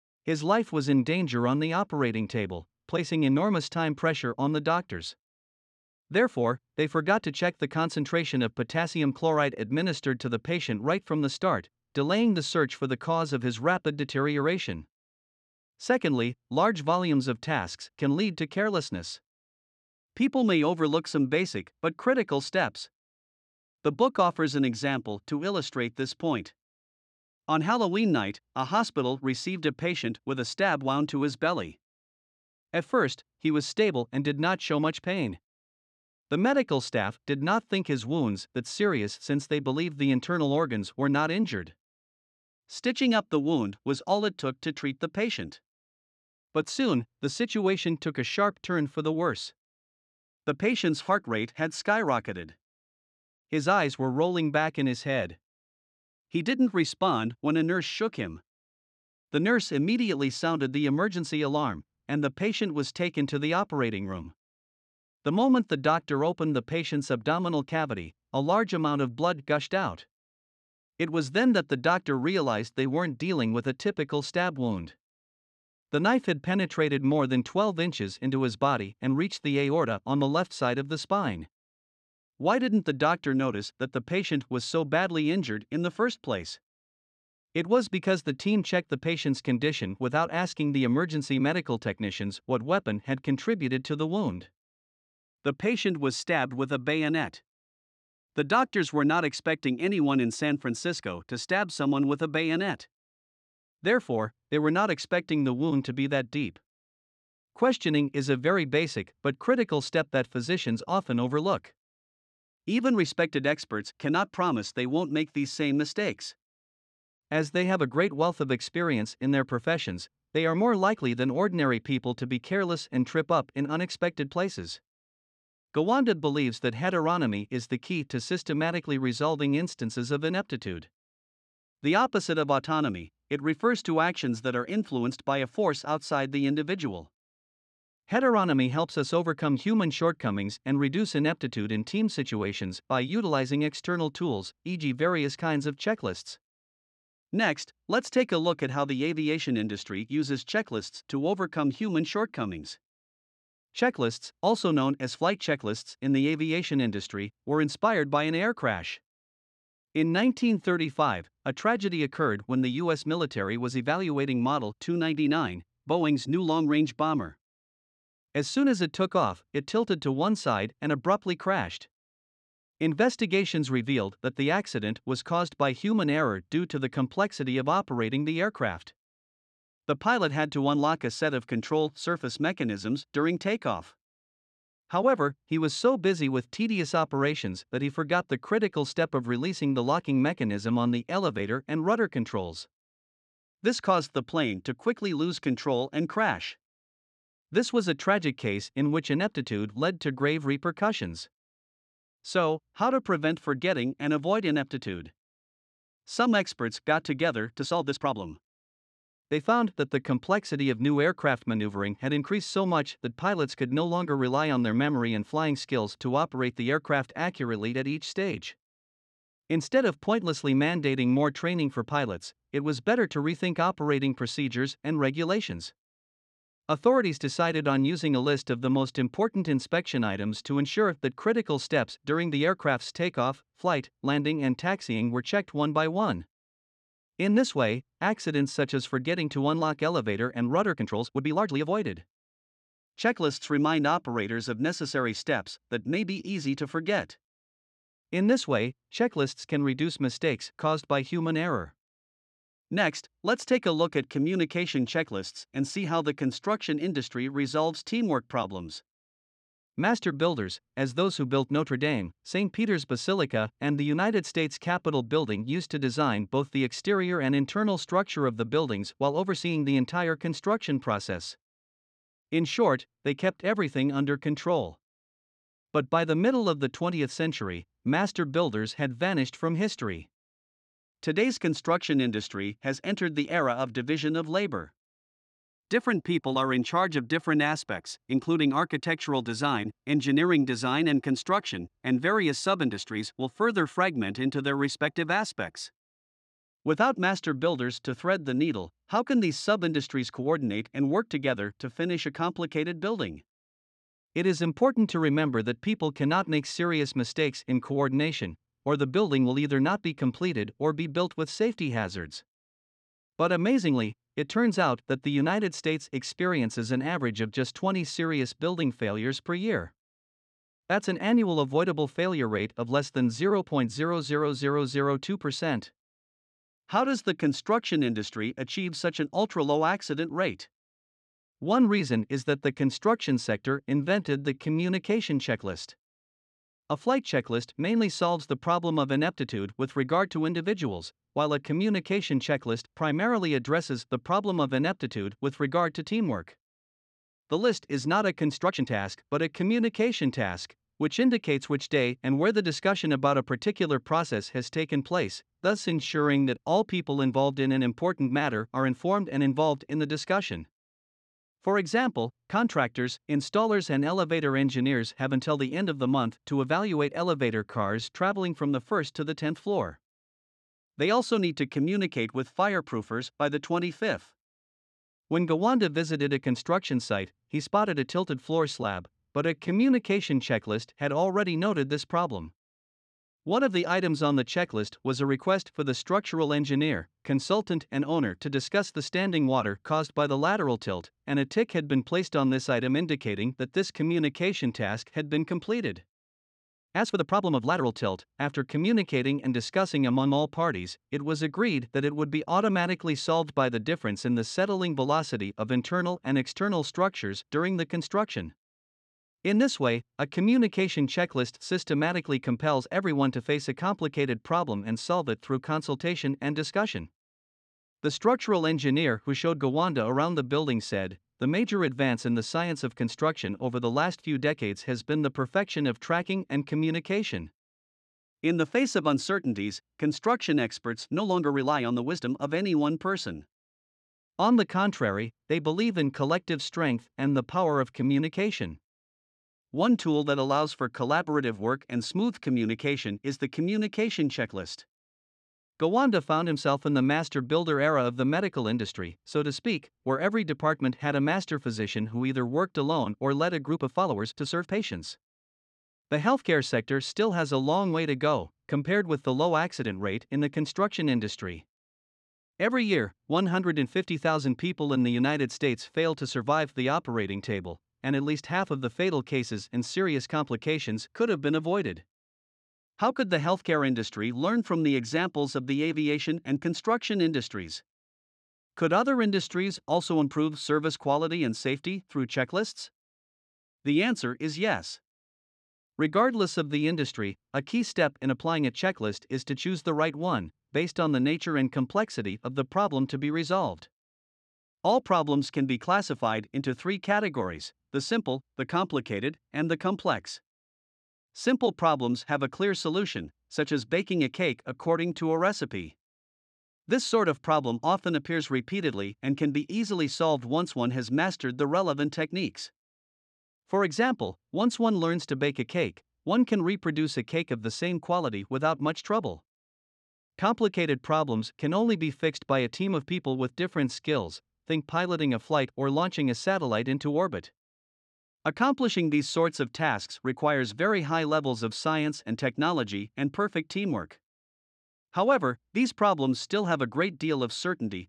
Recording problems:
uneven, jittery; strongly; from 1:57 to 8:44

